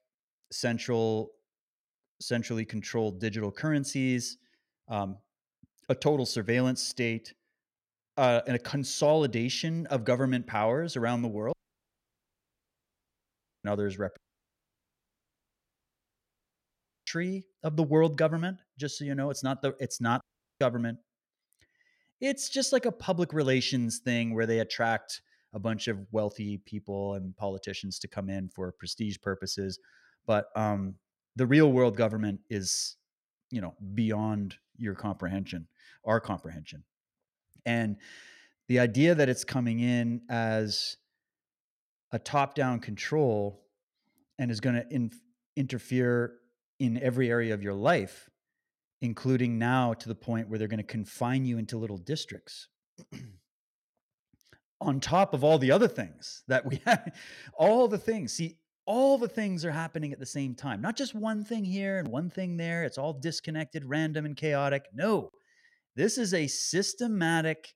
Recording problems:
audio cutting out; at 12 s for 2 s, at 14 s for 3 s and at 20 s

